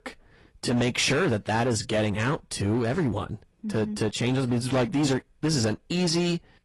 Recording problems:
distortion; slight; 11% of the sound clipped
garbled, watery; slightly; nothing above 11 kHz

